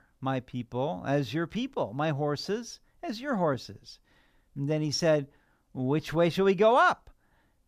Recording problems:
none

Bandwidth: 14.5 kHz